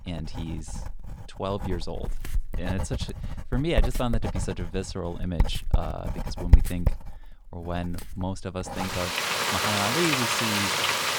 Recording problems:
household noises; very loud; throughout; 5 dB above the speech

